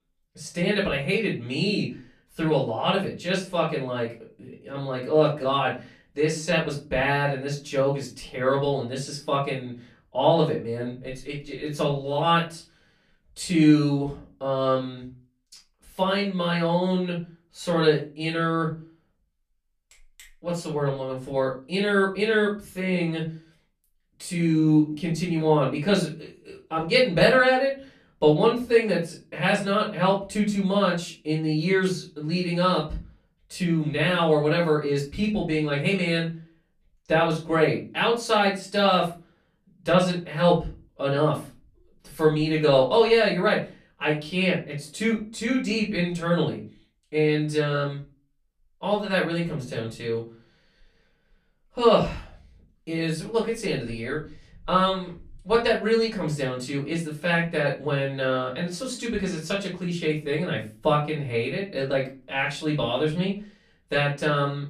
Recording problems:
off-mic speech; far
room echo; slight; dies away in 0.3 s

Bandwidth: 14.5 kHz